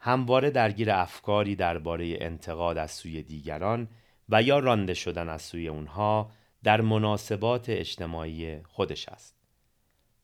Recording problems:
none

